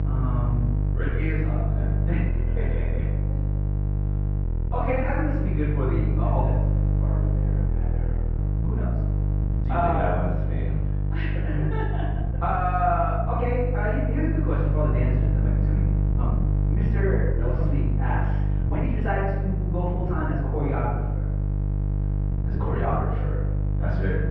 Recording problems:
room echo; strong; dies away in 0.9 s
off-mic speech; far
muffled; very; fading above 2 kHz
electrical hum; loud; throughout; 50 Hz, 9 dB below the speech
uneven, jittery; strongly; from 1 to 23 s

